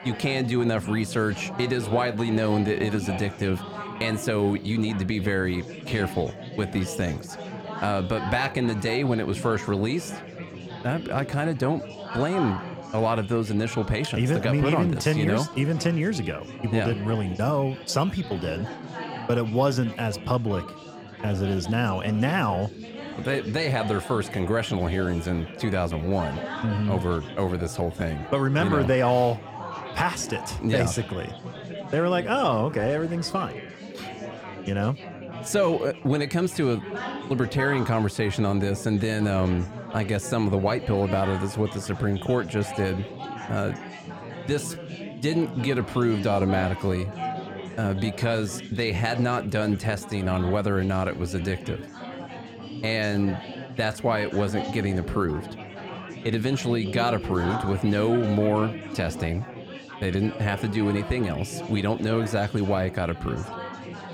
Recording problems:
chatter from many people; noticeable; throughout; 10 dB below the speech

